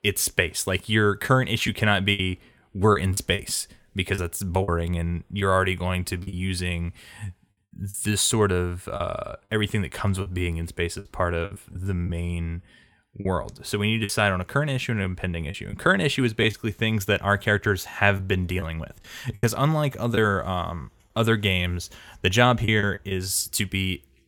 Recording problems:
choppy; very; 5% of the speech affected

